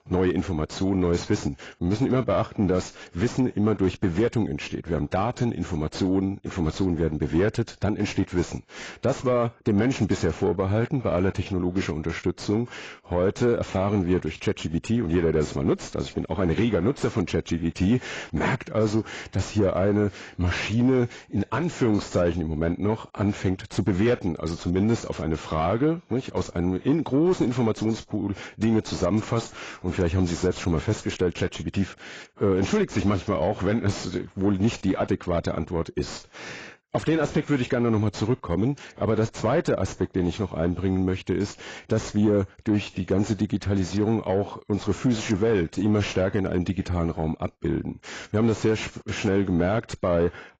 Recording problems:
garbled, watery; badly; nothing above 7.5 kHz
distortion; slight; 10 dB below the speech

